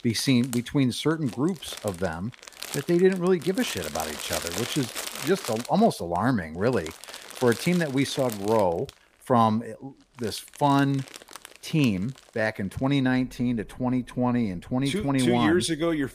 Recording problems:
household noises; noticeable; throughout; 10 dB below the speech

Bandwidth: 15 kHz